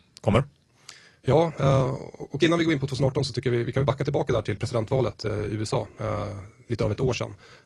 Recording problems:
wrong speed, natural pitch; too fast; 1.5 times normal speed
garbled, watery; slightly

